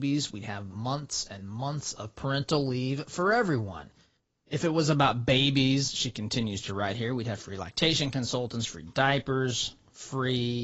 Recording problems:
garbled, watery; badly; nothing above 7.5 kHz
abrupt cut into speech; at the start and the end

